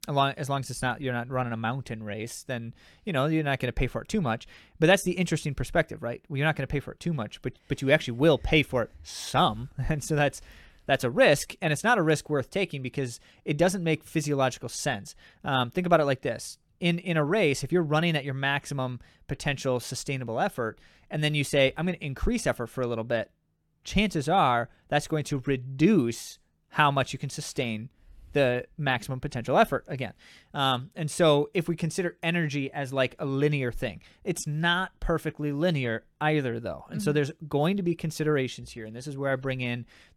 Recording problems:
none

